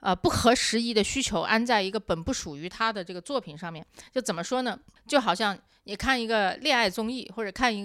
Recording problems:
abrupt cut into speech; at the end

